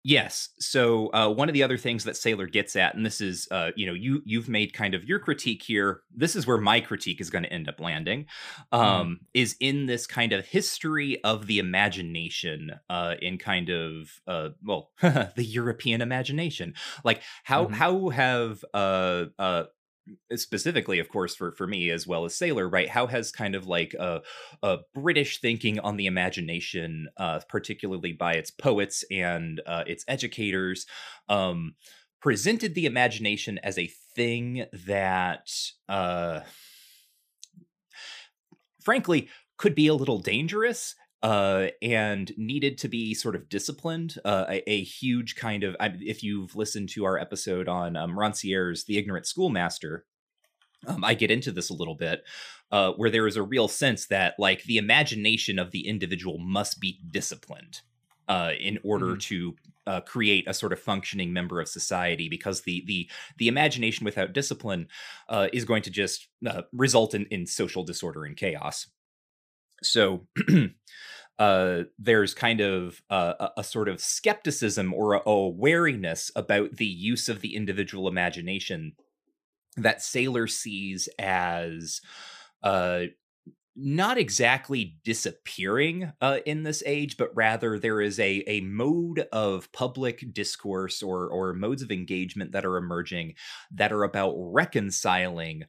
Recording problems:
none

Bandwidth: 15 kHz